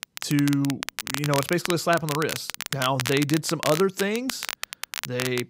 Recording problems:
crackle, like an old record; loud; 6 dB below the speech

